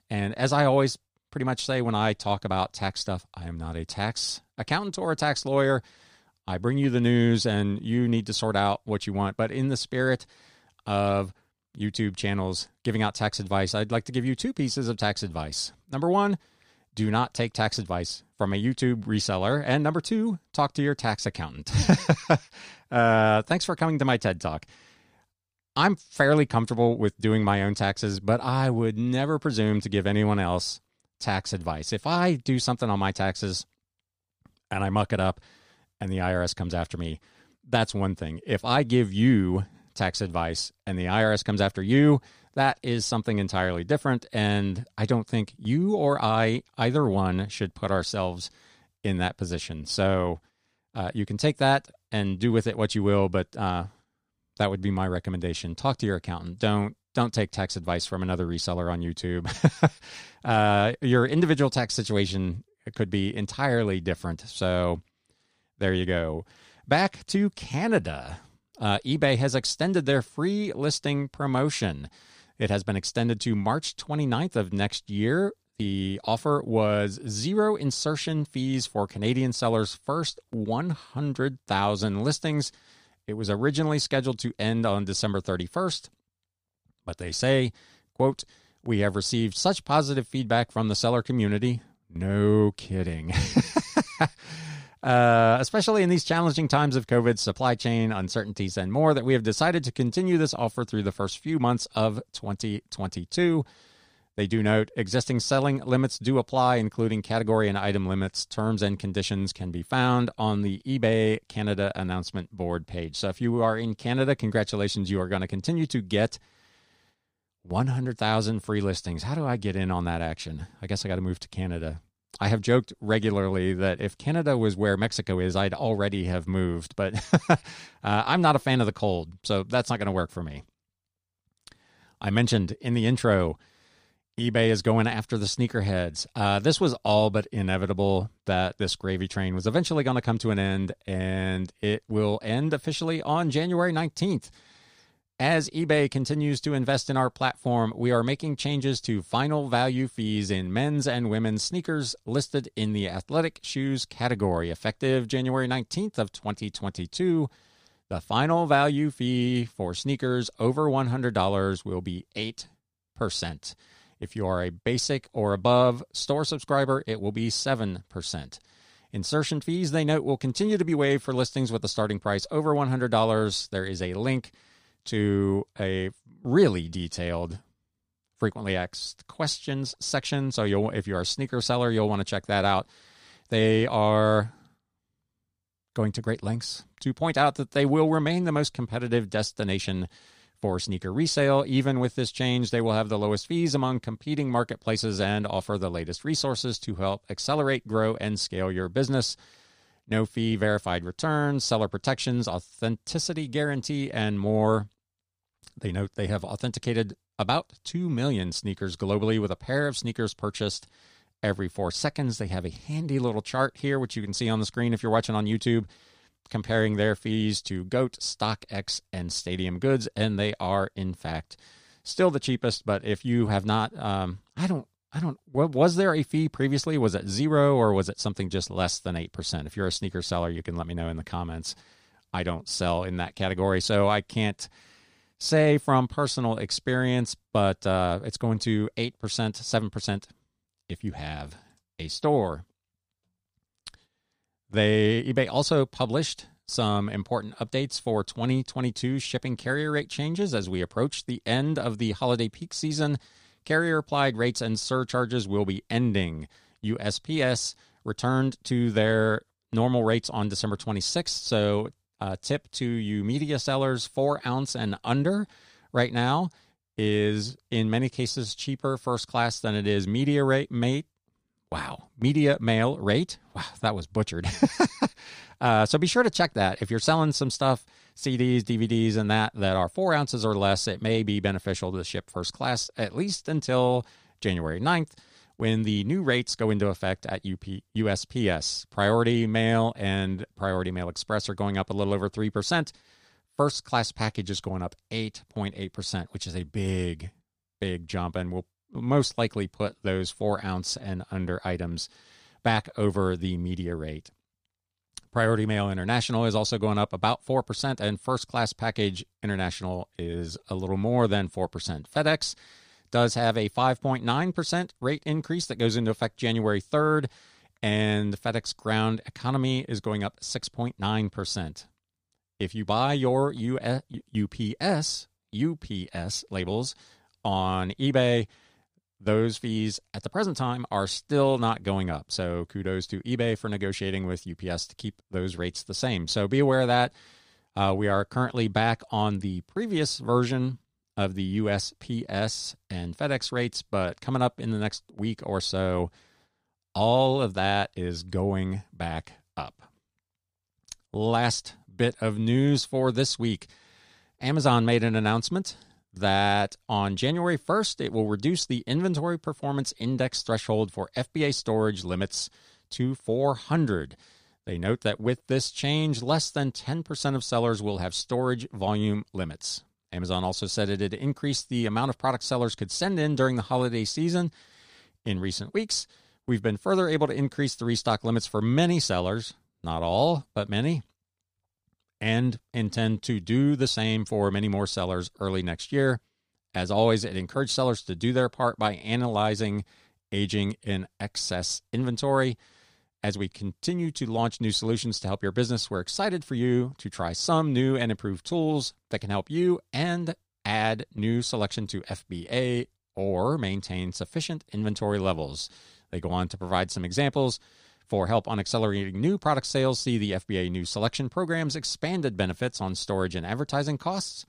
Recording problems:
none

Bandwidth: 15 kHz